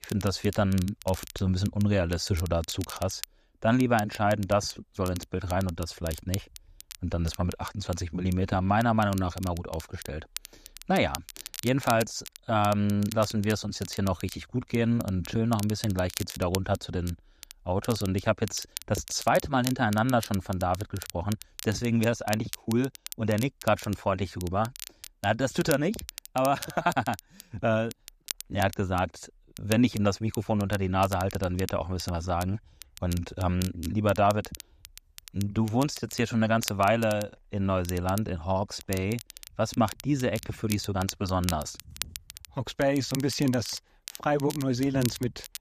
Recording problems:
crackle, like an old record; noticeable; 15 dB below the speech

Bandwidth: 14.5 kHz